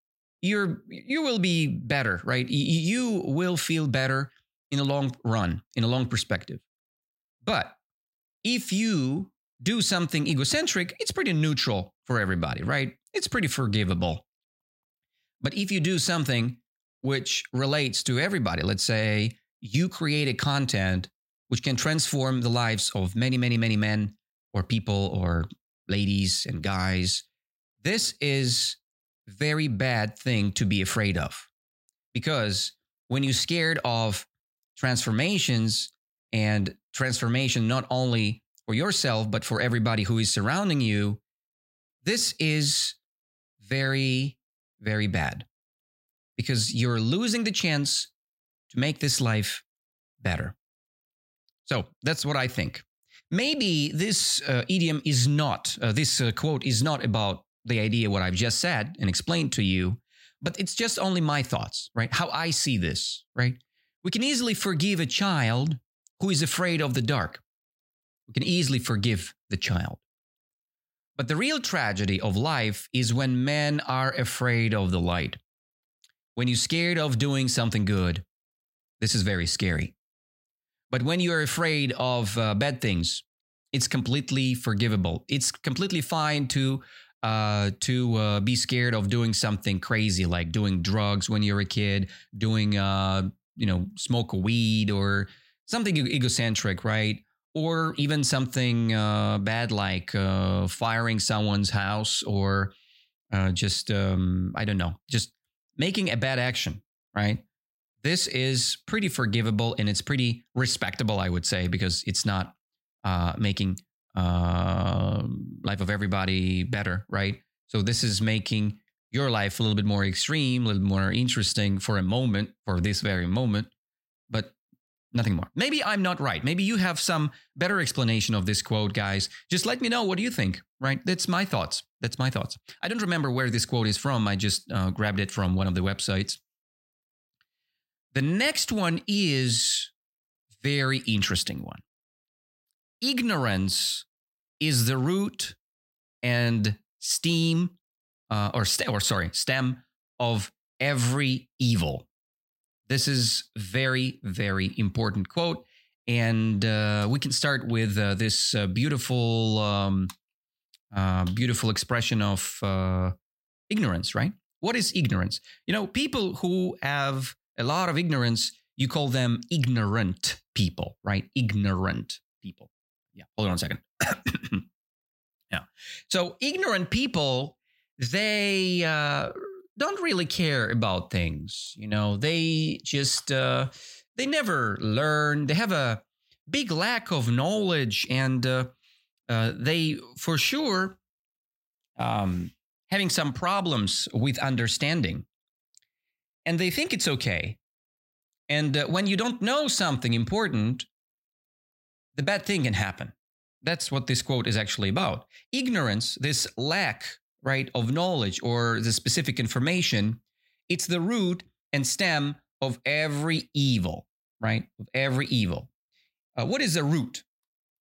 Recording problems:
none

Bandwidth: 16 kHz